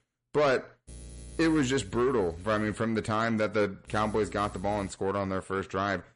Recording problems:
distortion; slight; 10 dB below the speech
garbled, watery; slightly; nothing above 10.5 kHz
electrical hum; faint; from 1 to 3 s and from 4 to 5 s; 60 Hz, 25 dB below the speech

